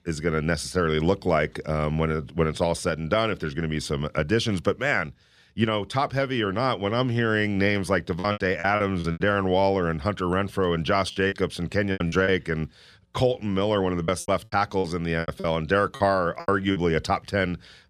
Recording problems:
choppy; very; from 8 to 9 s, from 11 to 12 s and from 14 to 17 s; 14% of the speech affected

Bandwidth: 14 kHz